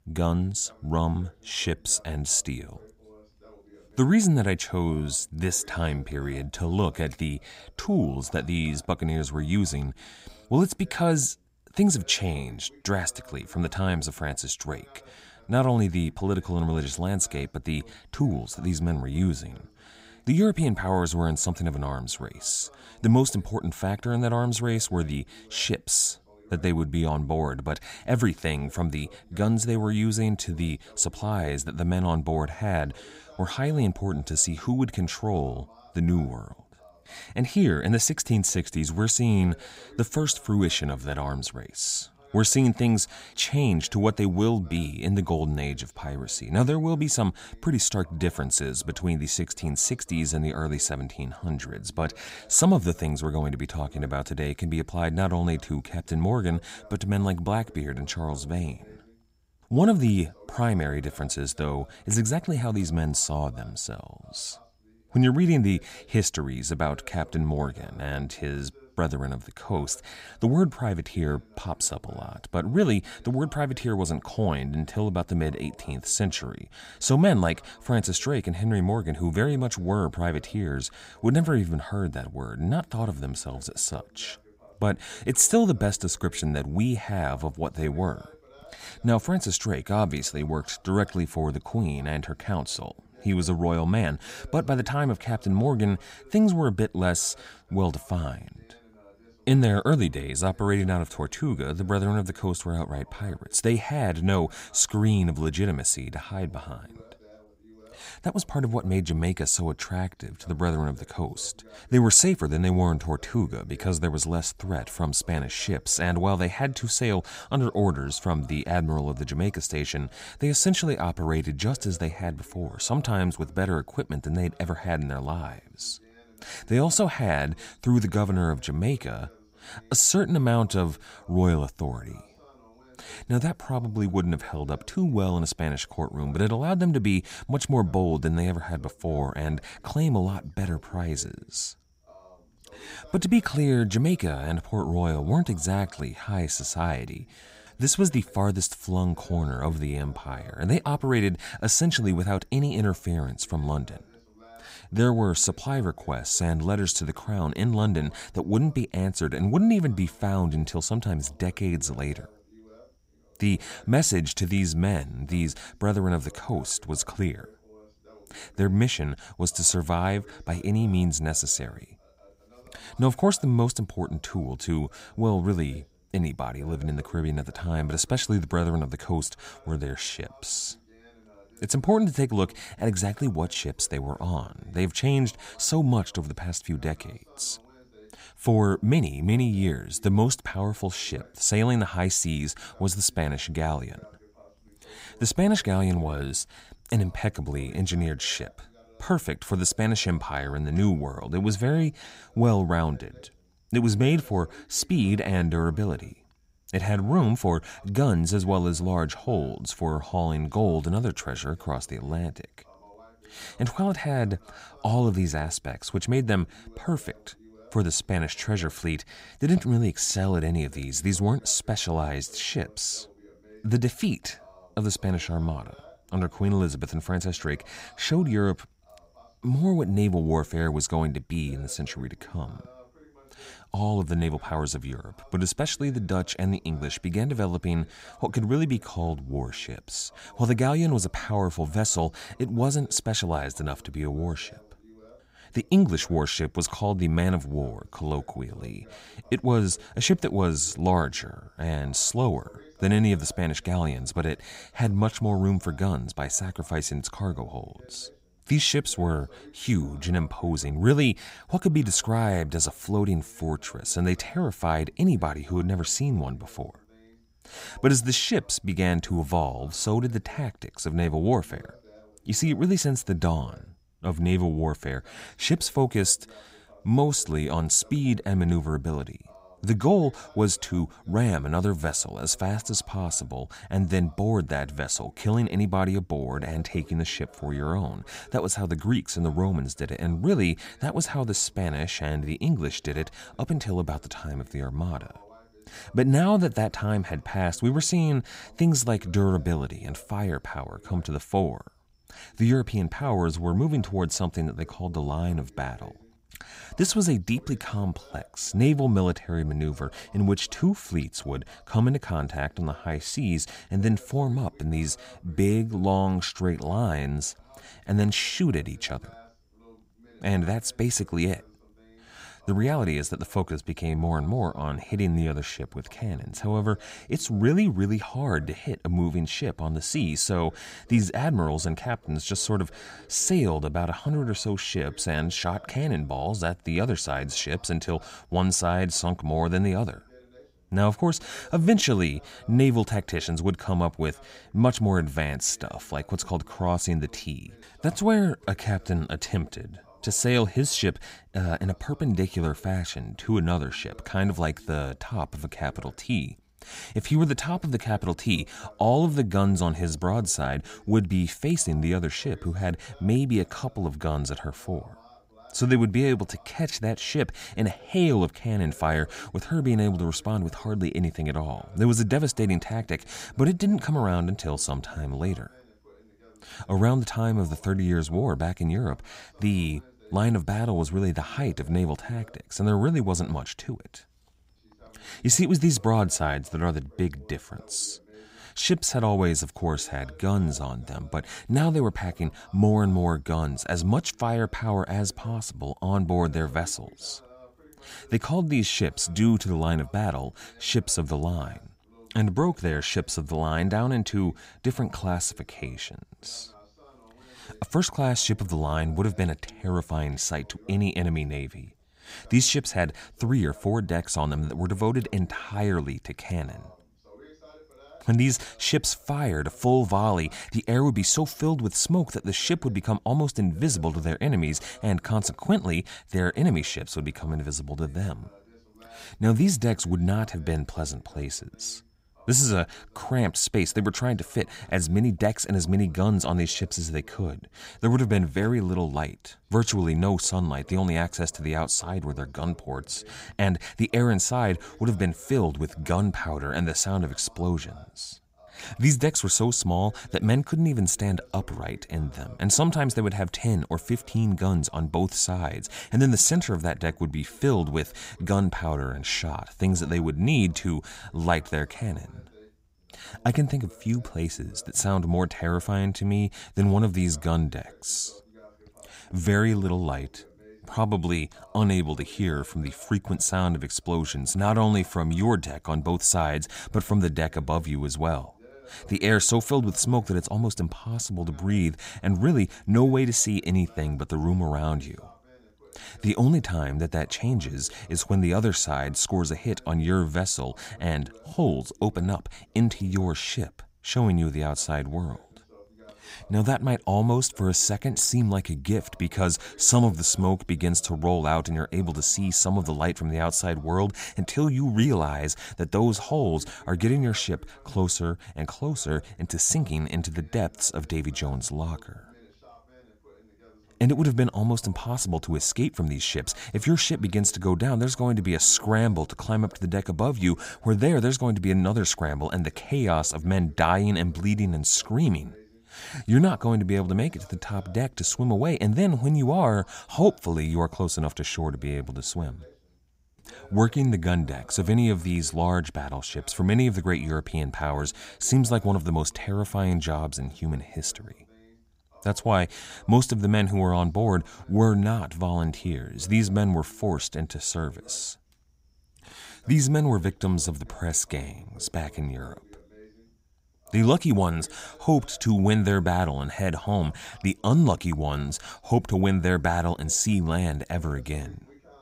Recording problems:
voice in the background; faint; throughout; 30 dB below the speech

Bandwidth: 15.5 kHz